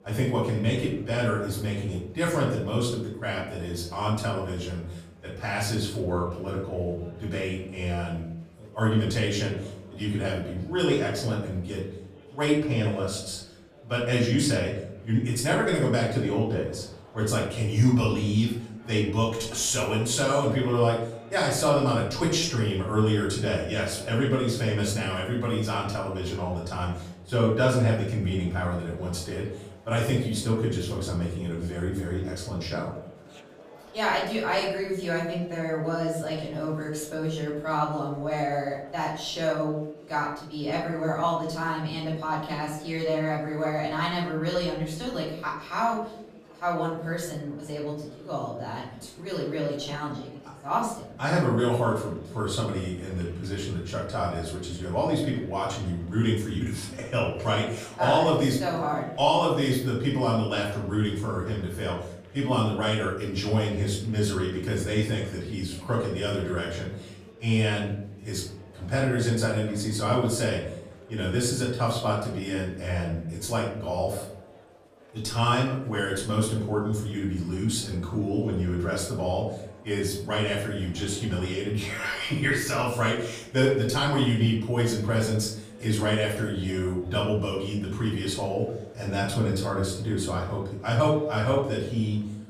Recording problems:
off-mic speech; far
room echo; noticeable; dies away in 0.7 s
murmuring crowd; faint; throughout; 25 dB below the speech

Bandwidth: 15 kHz